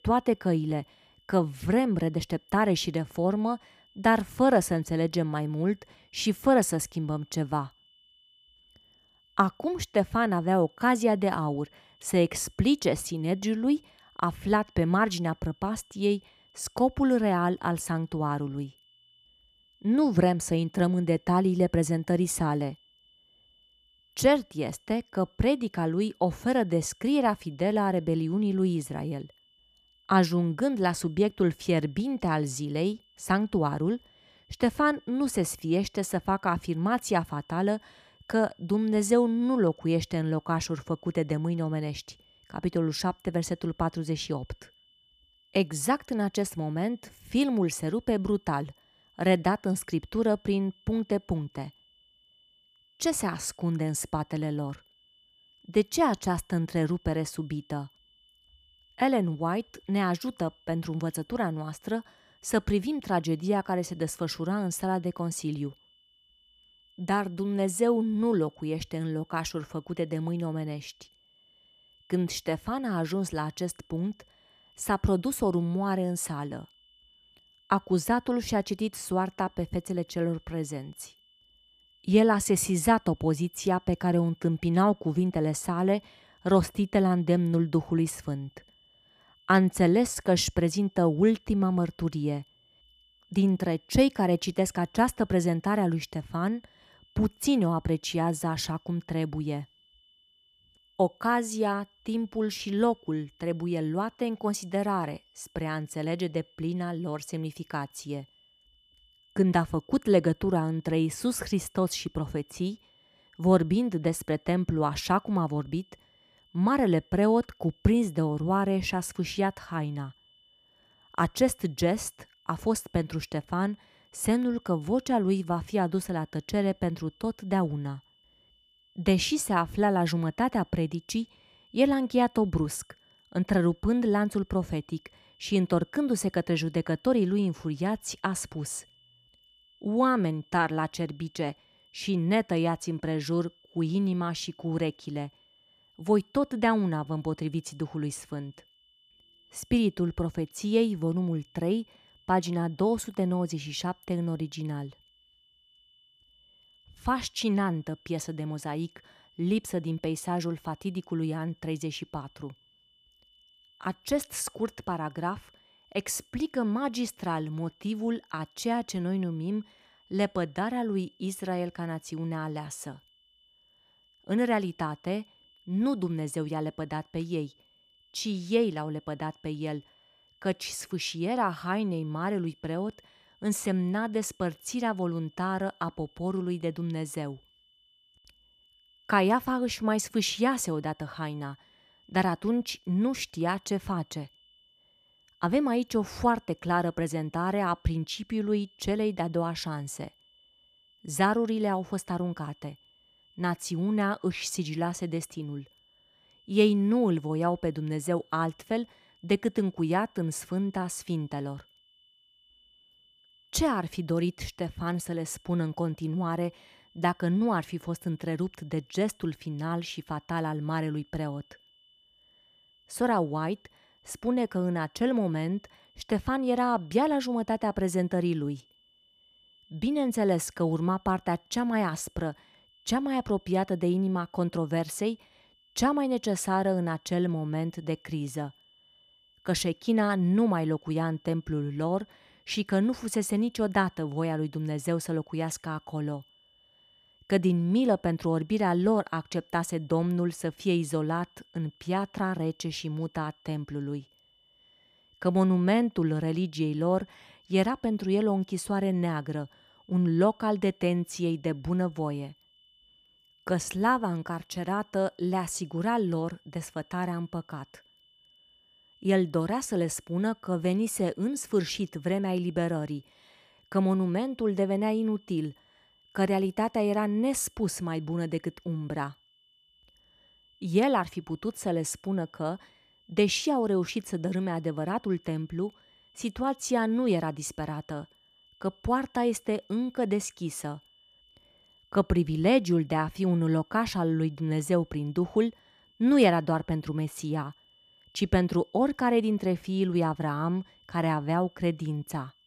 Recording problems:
high-pitched whine; faint; throughout; 3 kHz, 30 dB below the speech

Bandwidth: 14.5 kHz